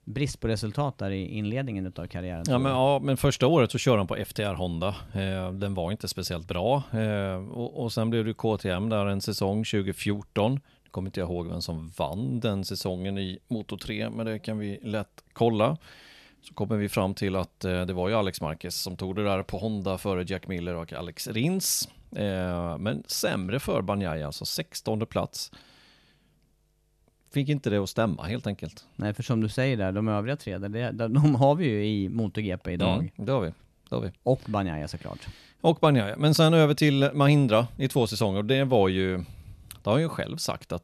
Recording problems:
none

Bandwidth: 13.5 kHz